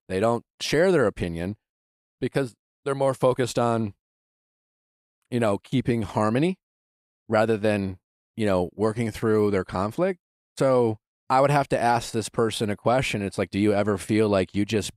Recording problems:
none

